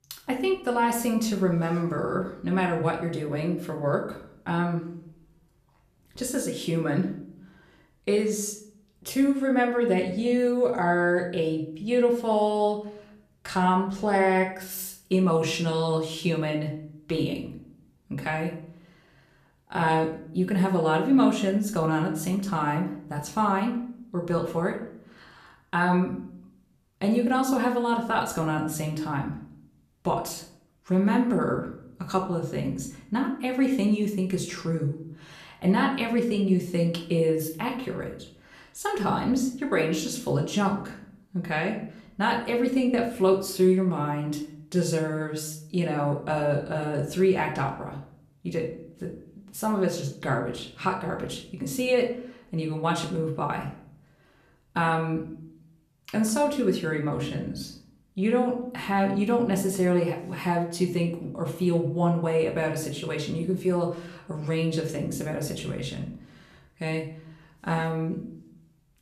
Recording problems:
room echo; slight; dies away in 0.5 s
off-mic speech; somewhat distant

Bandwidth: 14.5 kHz